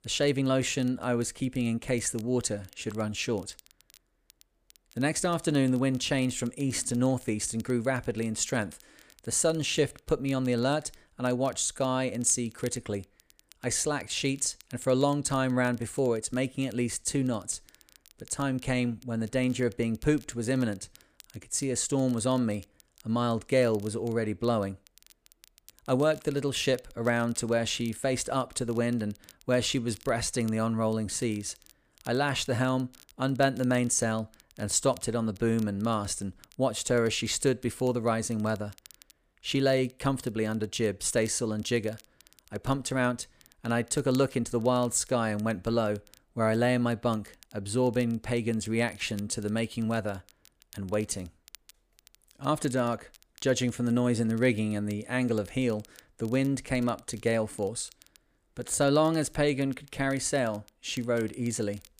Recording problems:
crackle, like an old record; faint; 25 dB below the speech

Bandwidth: 15 kHz